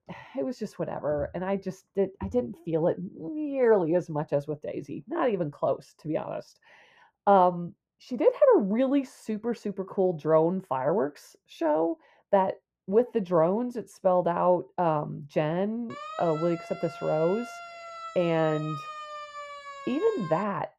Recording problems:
muffled; very; fading above 2 kHz
siren; faint; from 16 s on; peak 10 dB below the speech

